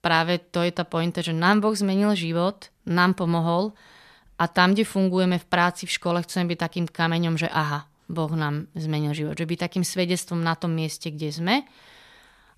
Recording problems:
none

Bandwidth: 14.5 kHz